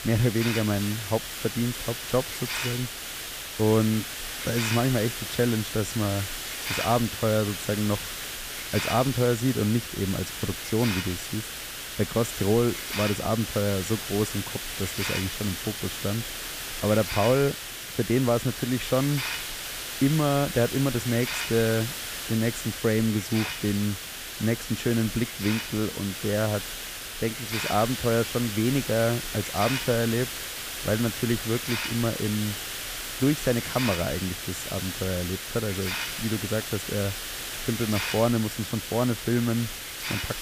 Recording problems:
hiss; loud; throughout; 4 dB below the speech

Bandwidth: 15 kHz